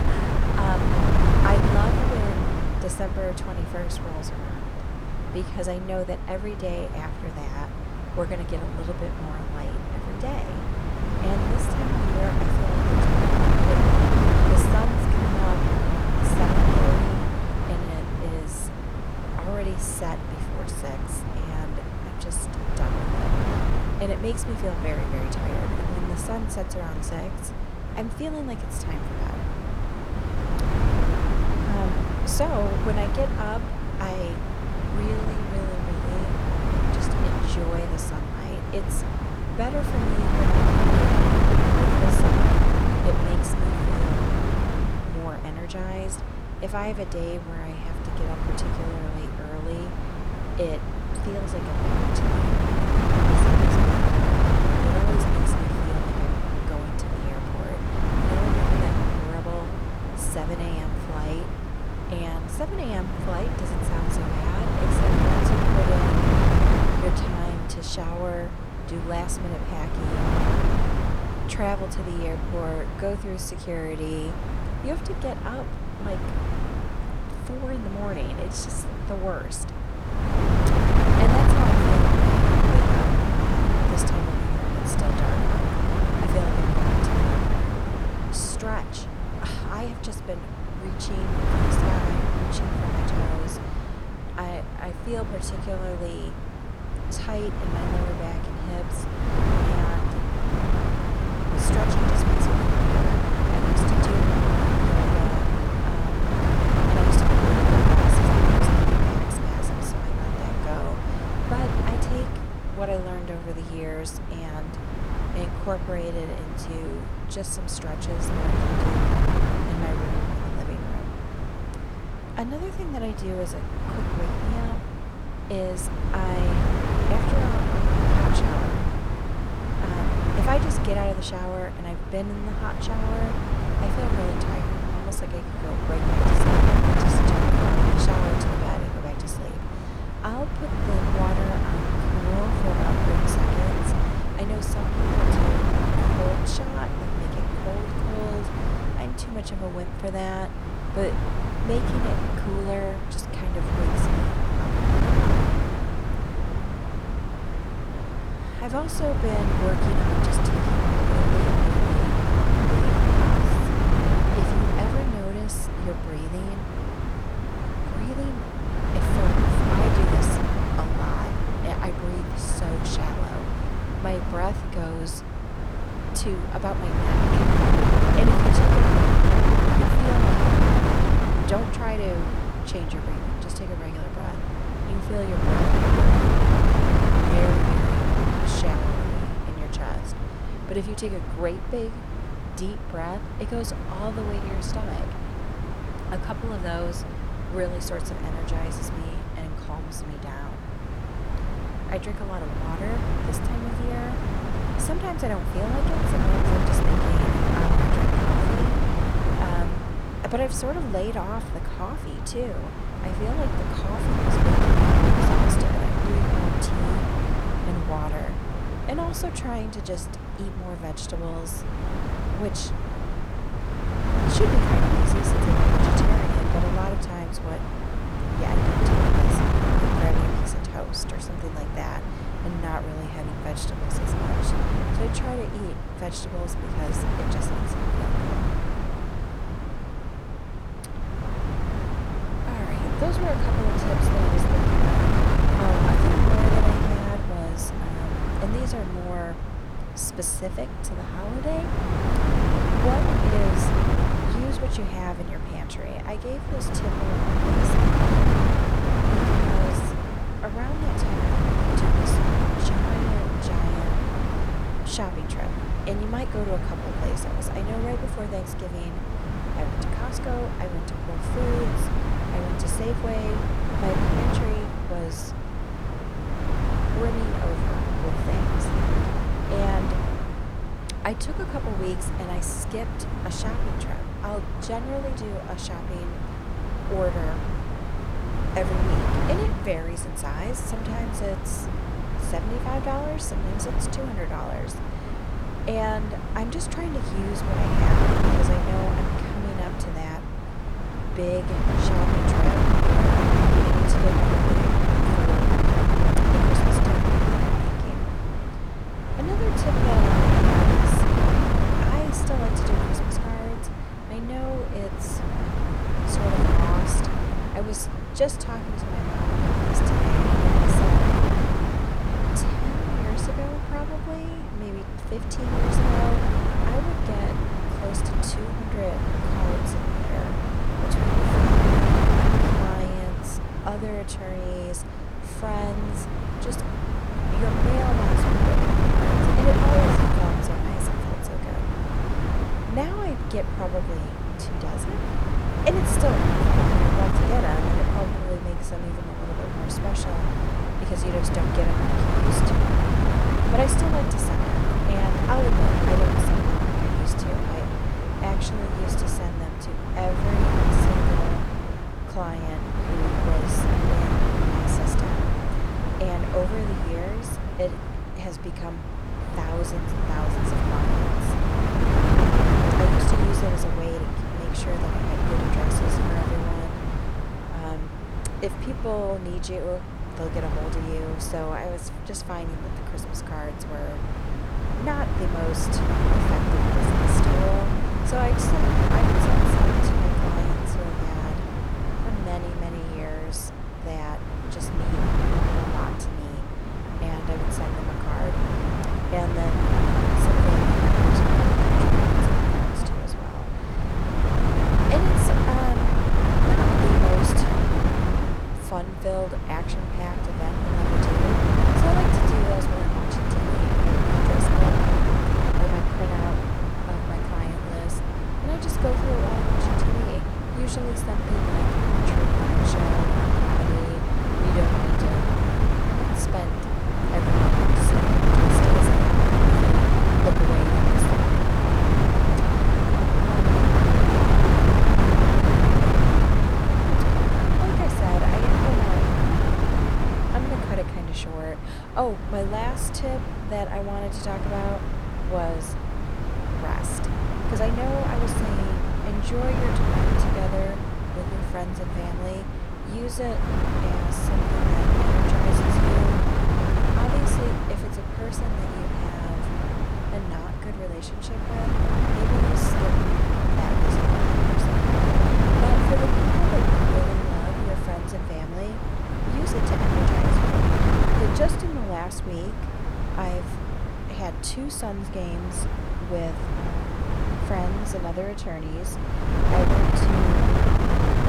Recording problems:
wind noise on the microphone; heavy; 4 dB above the speech

